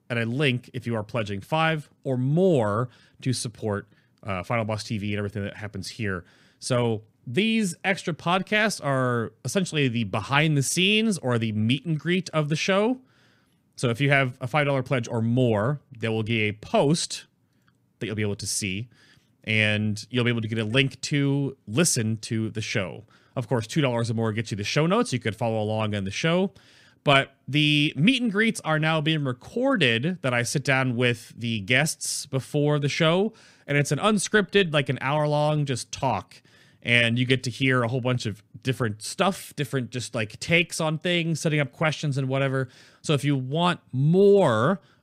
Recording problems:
none

